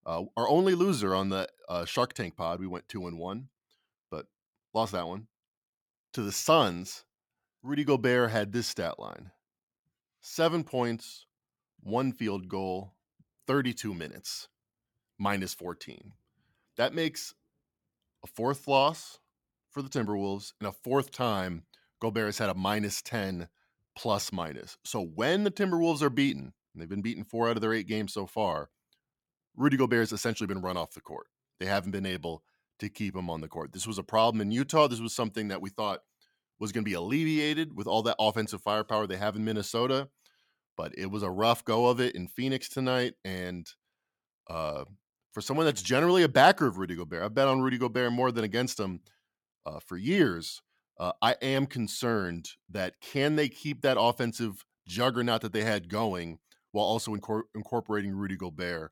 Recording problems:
none

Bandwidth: 17.5 kHz